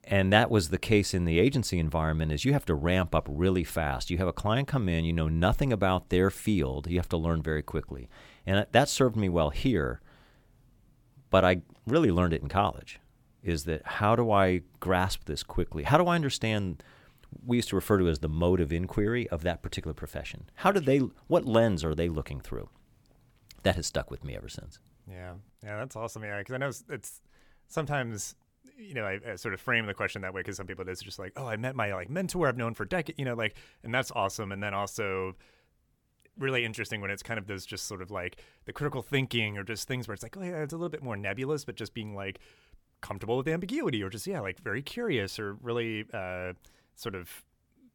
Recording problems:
none

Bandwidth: 18 kHz